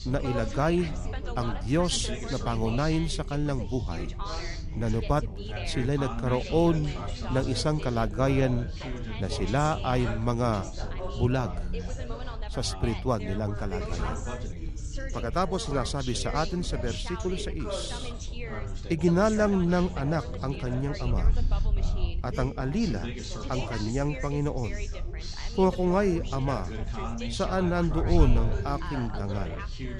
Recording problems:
background chatter; loud; throughout; 3 voices, 9 dB below the speech
wind noise on the microphone; occasional gusts; 25 dB below the speech

